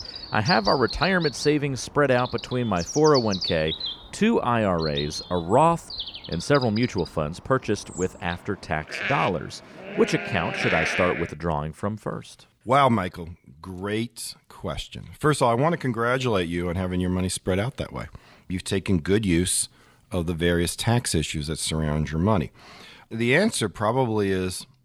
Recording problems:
animal sounds; loud; until 11 s; 6 dB below the speech

